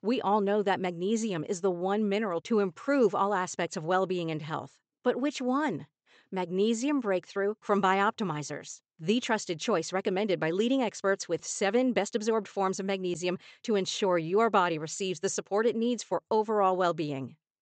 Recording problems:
high frequencies cut off; noticeable; nothing above 8 kHz

